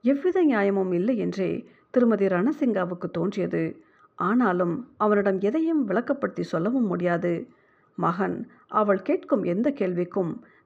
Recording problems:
muffled; very; fading above 4 kHz

